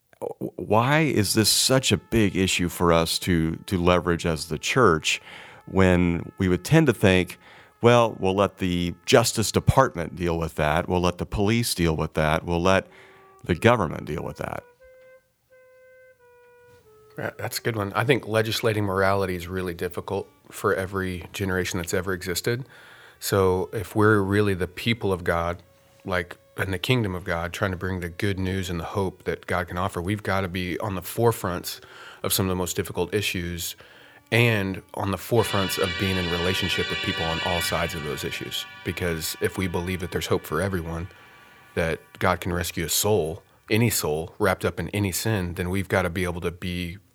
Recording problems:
background music; loud; throughout; 7 dB below the speech

